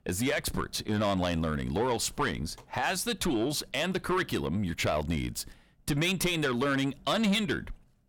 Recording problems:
distortion; slight; 10 dB below the speech

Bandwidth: 18 kHz